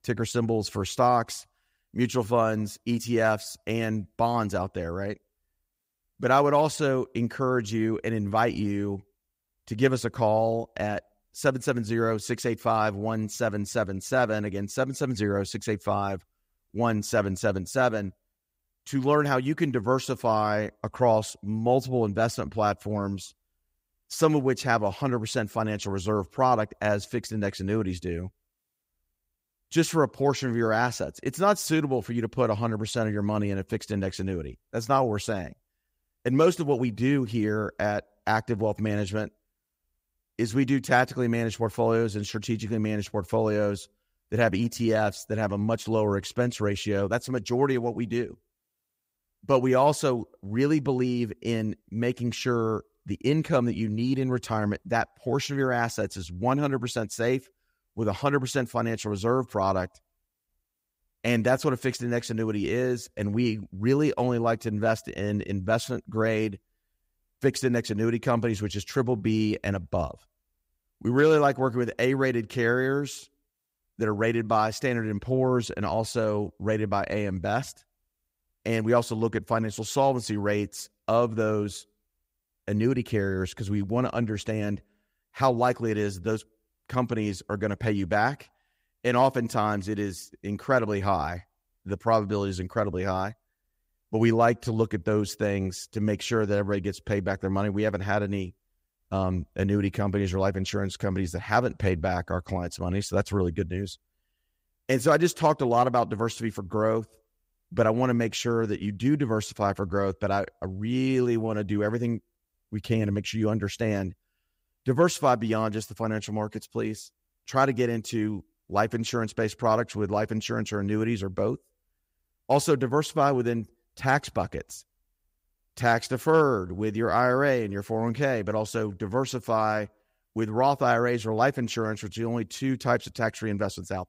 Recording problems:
none

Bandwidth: 15.5 kHz